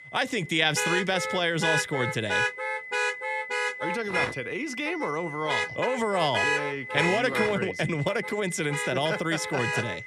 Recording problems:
high-pitched whine; loud; throughout; 2 kHz, 10 dB below the speech
traffic noise; loud; throughout; 1 dB below the speech

